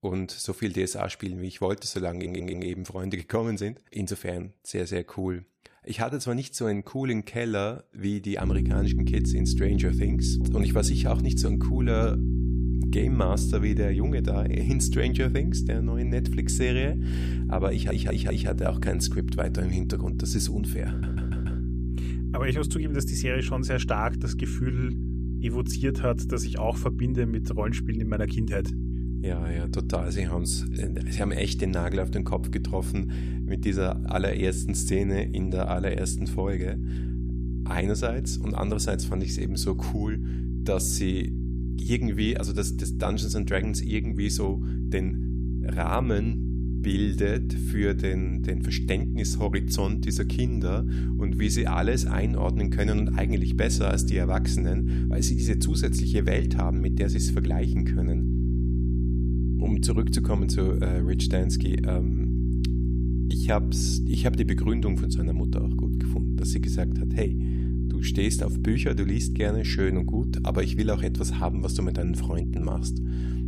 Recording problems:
electrical hum; loud; from 8.5 s on; 60 Hz, 6 dB below the speech
audio stuttering; at 2 s, at 18 s and at 21 s

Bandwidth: 14.5 kHz